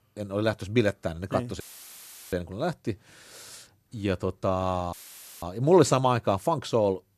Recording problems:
audio cutting out; filled with static; at 1.5 s for 0.5 s and at 5 s

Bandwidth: 13.5 kHz